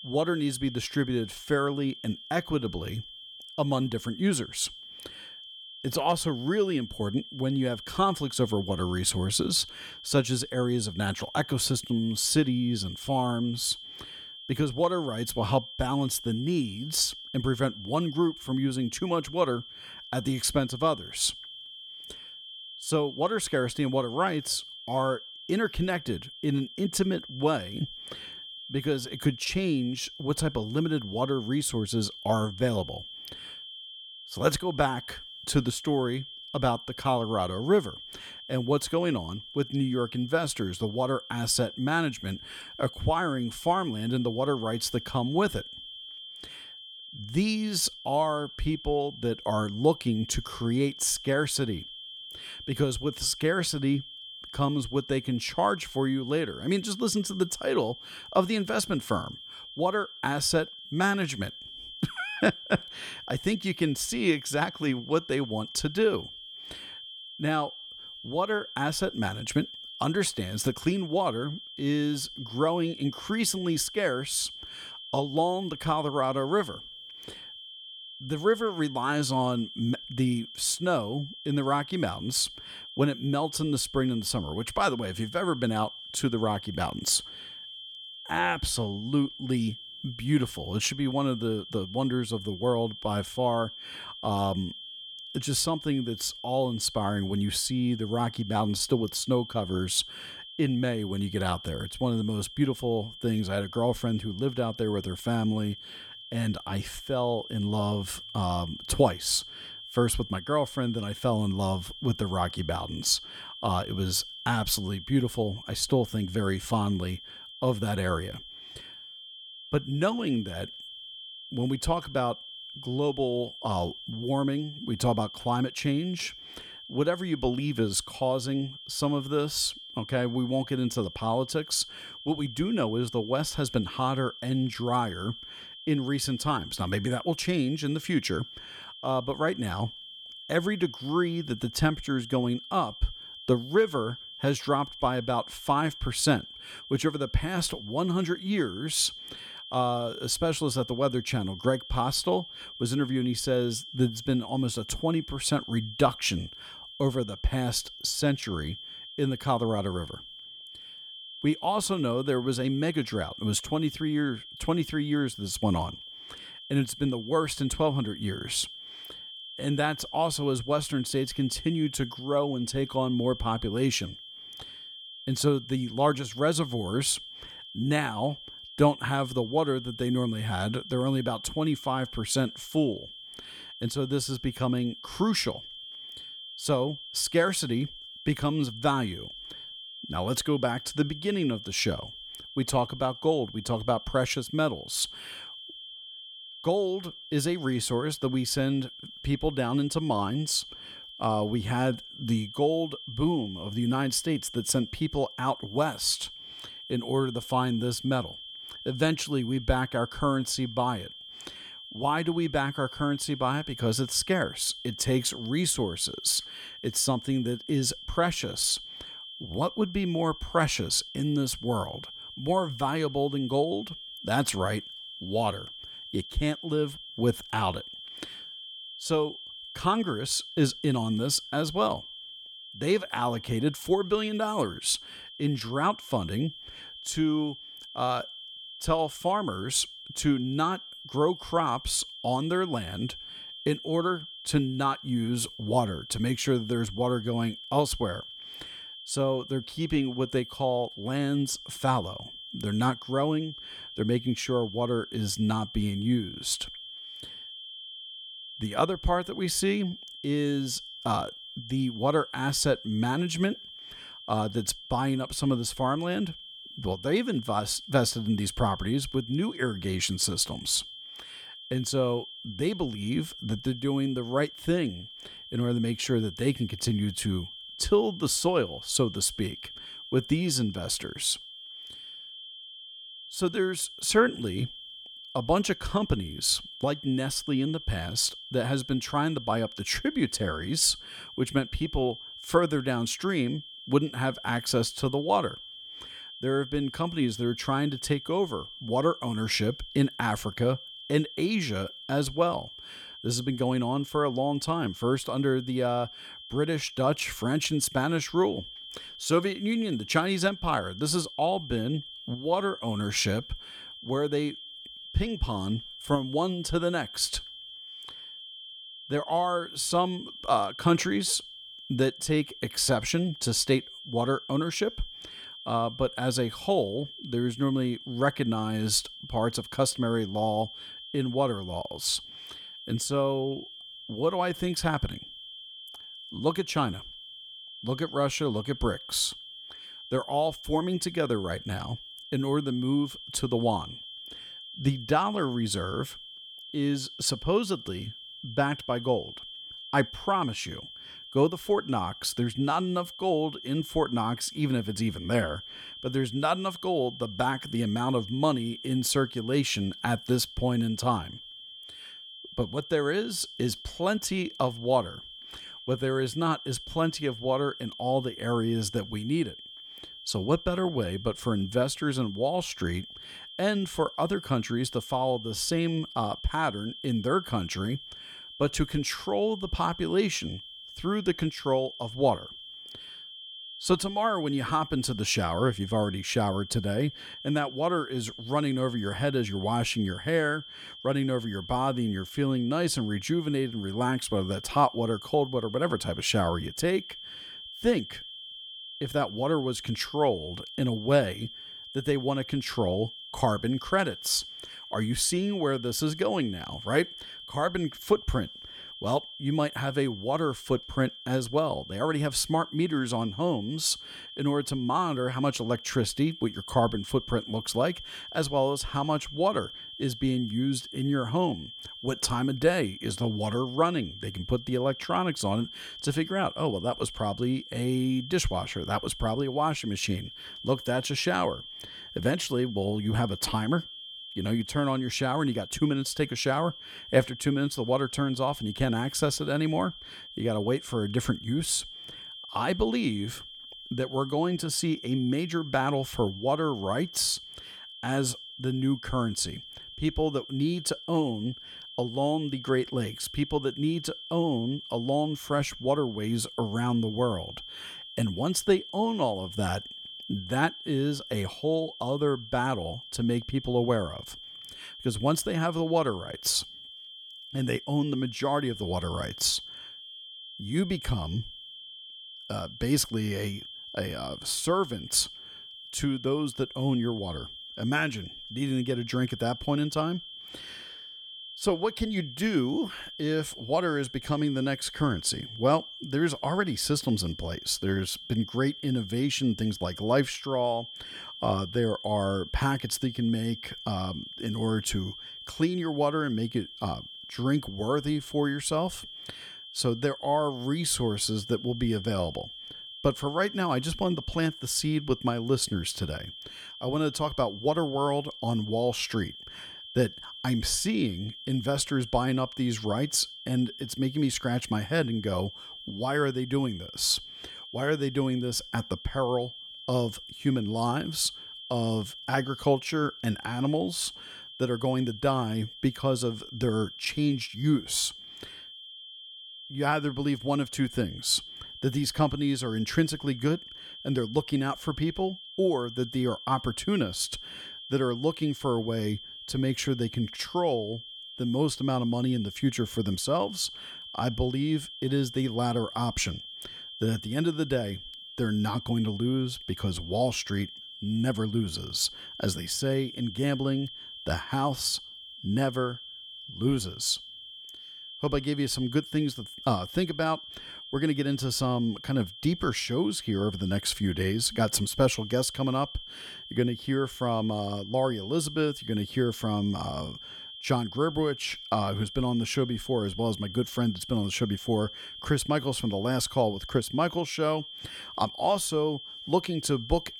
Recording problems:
high-pitched whine; noticeable; throughout; 3 kHz, 10 dB below the speech

